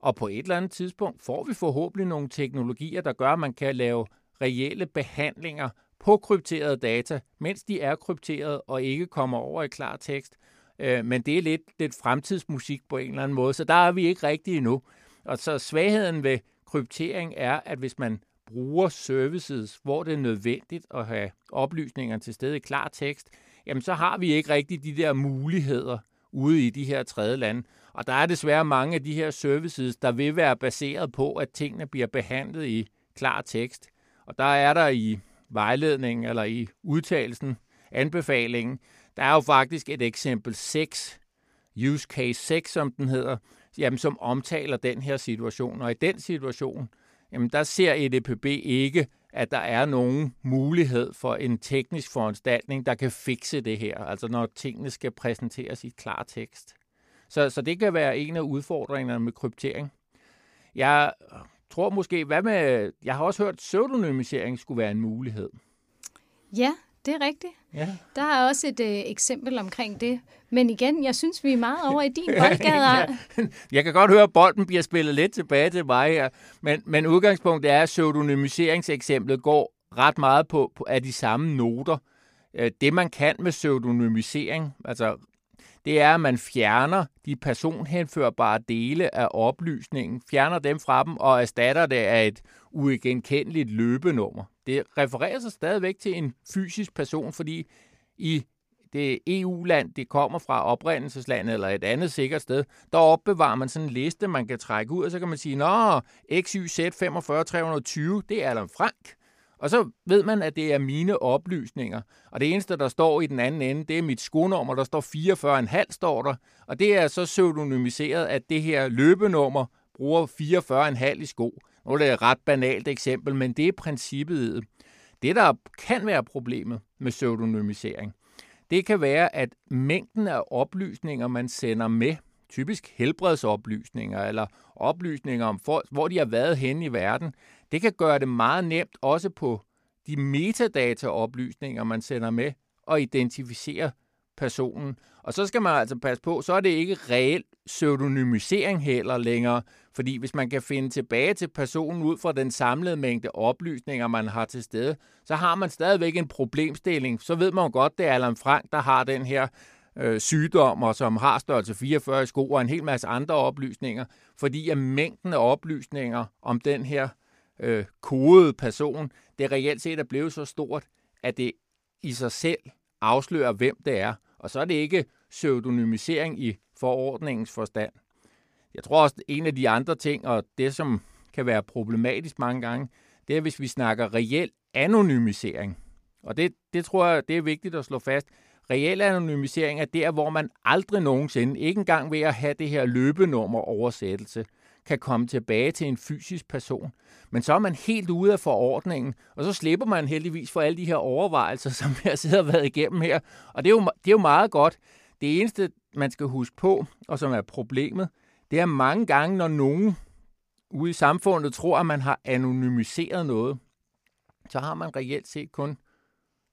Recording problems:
none

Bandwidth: 15 kHz